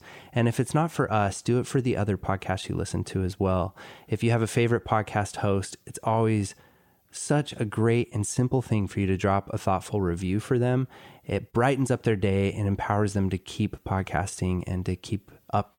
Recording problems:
none

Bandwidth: 17.5 kHz